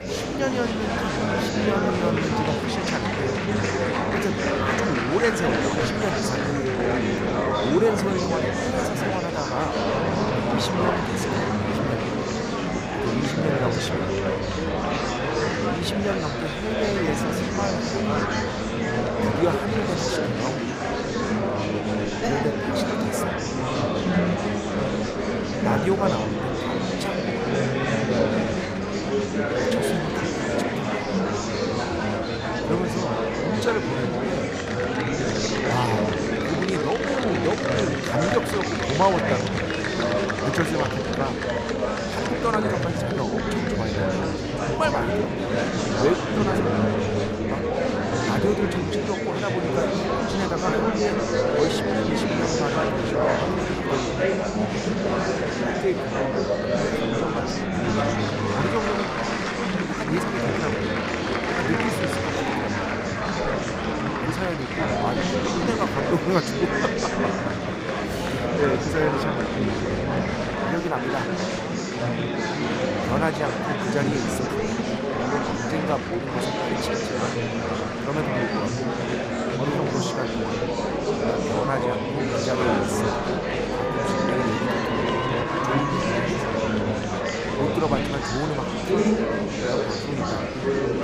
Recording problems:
murmuring crowd; very loud; throughout; 5 dB above the speech

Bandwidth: 15.5 kHz